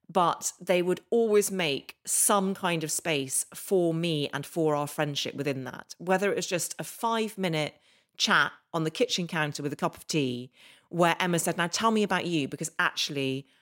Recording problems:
none

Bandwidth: 16 kHz